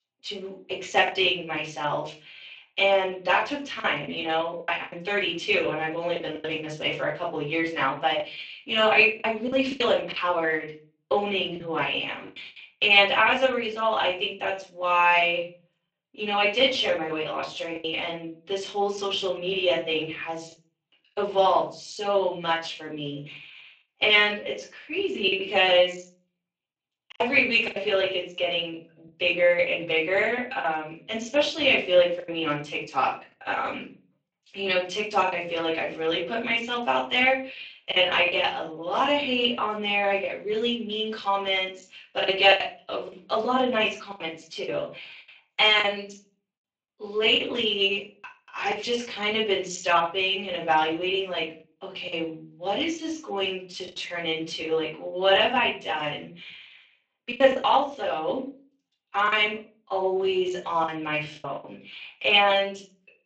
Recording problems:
off-mic speech; far
thin; somewhat; fading below 400 Hz
room echo; slight; dies away in 0.4 s
garbled, watery; slightly; nothing above 7.5 kHz
choppy; occasionally; 4% of the speech affected

